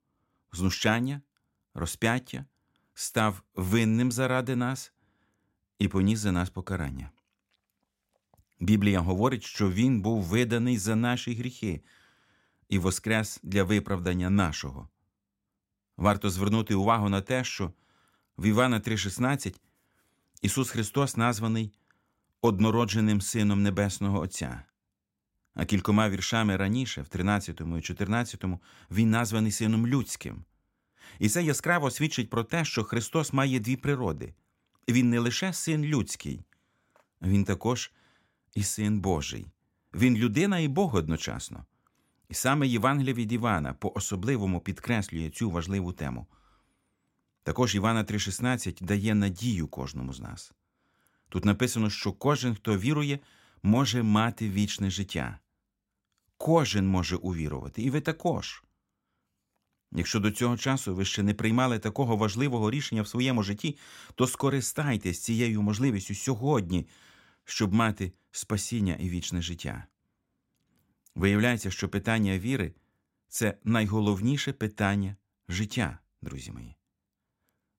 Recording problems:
none

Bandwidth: 16 kHz